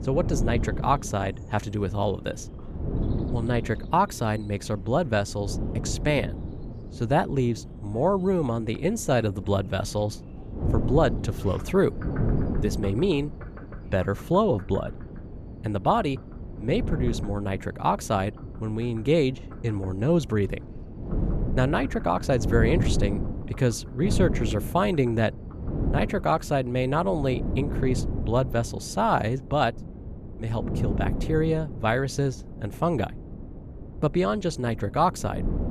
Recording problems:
wind noise on the microphone; occasional gusts; 15 dB below the speech
animal sounds; faint; throughout; 25 dB below the speech

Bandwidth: 14.5 kHz